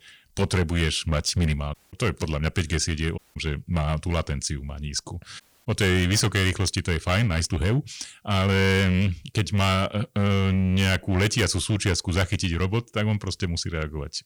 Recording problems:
distortion; slight; 8% of the sound clipped
audio cutting out; at 1.5 s, at 3 s and at 5.5 s

